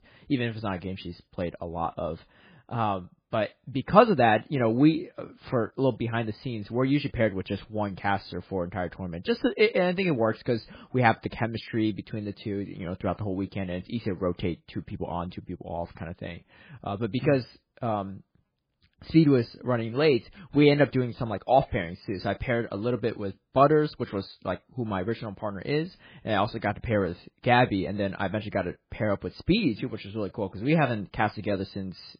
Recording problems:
garbled, watery; badly; nothing above 4 kHz

